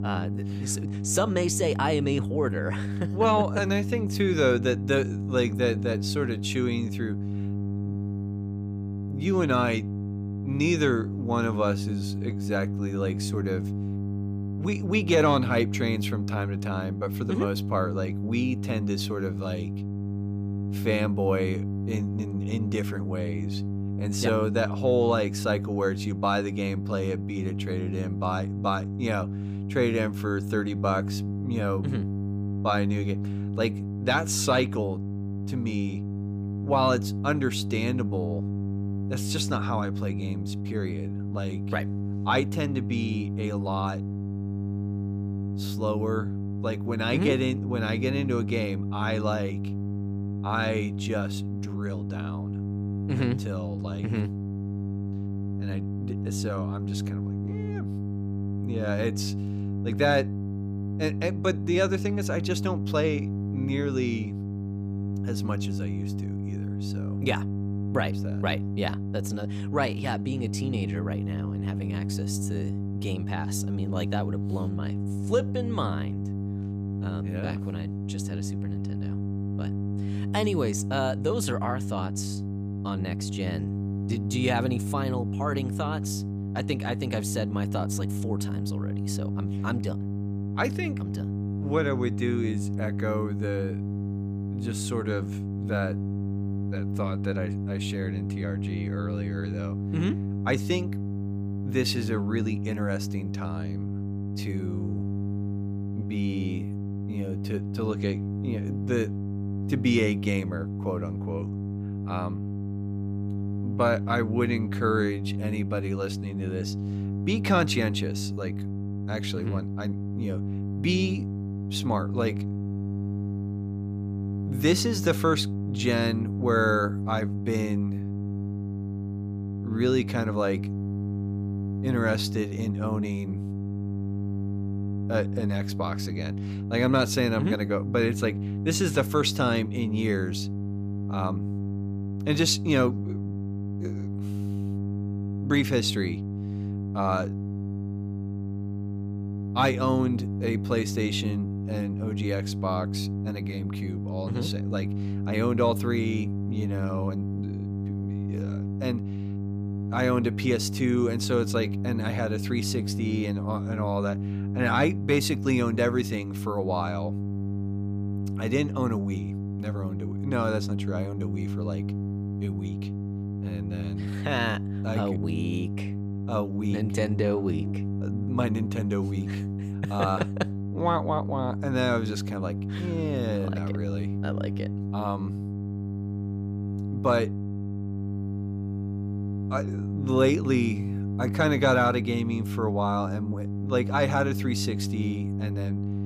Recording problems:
electrical hum; loud; throughout; 50 Hz, 10 dB below the speech

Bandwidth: 15 kHz